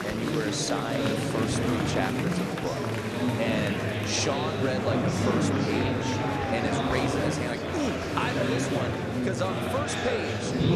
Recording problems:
murmuring crowd; very loud; throughout; 4 dB above the speech

